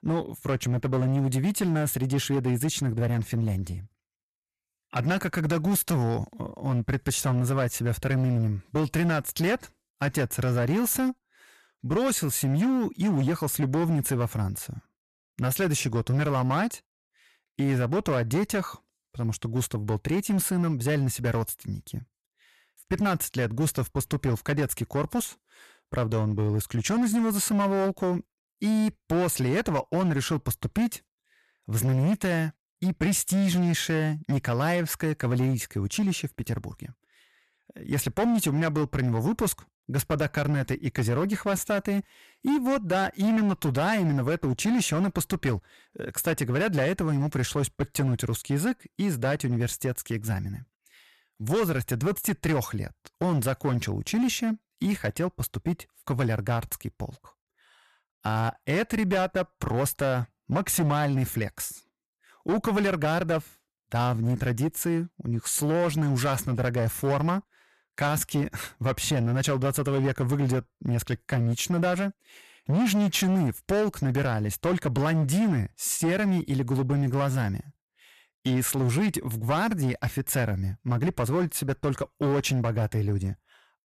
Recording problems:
distortion; slight; 12% of the sound clipped

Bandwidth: 14 kHz